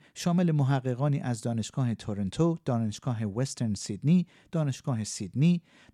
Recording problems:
none

